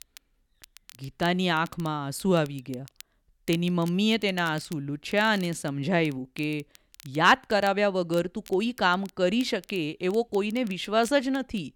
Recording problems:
crackle, like an old record; faint; 25 dB below the speech

